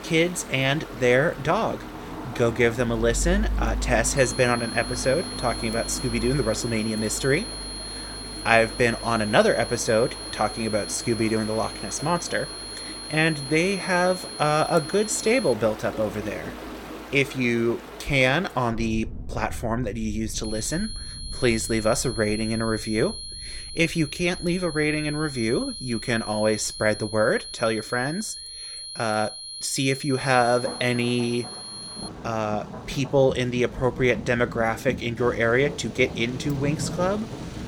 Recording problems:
high-pitched whine; noticeable; from 4 to 16 s and from 20 to 32 s; 4 kHz, 10 dB below the speech
rain or running water; noticeable; throughout; 15 dB below the speech

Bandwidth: 17.5 kHz